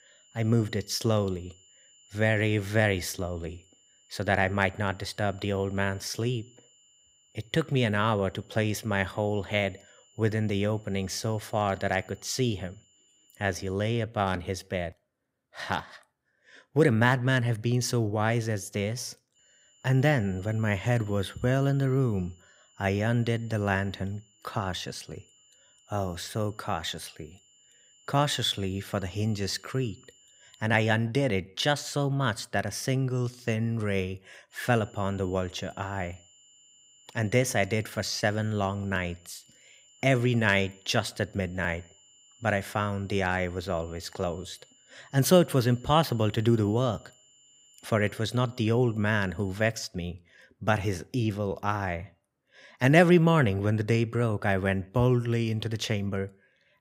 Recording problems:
high-pitched whine; faint; until 14 s, from 19 to 31 s and from 35 to 50 s; 7 kHz, 30 dB below the speech

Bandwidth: 15.5 kHz